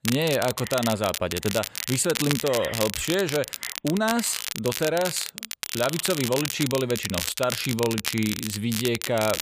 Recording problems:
crackle, like an old record; loud; 4 dB below the speech

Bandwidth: 15 kHz